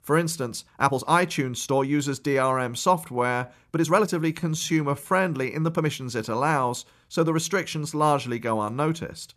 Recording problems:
uneven, jittery; strongly; from 0.5 to 7.5 s

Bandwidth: 14 kHz